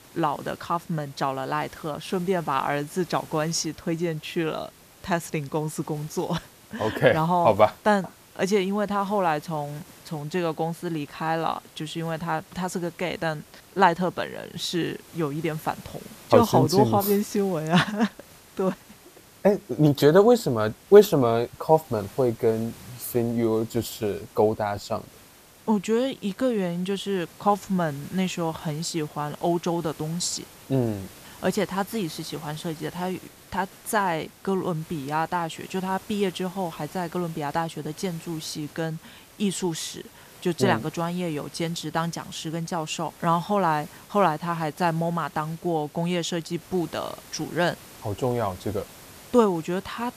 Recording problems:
hiss; faint; throughout; 20 dB below the speech

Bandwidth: 14.5 kHz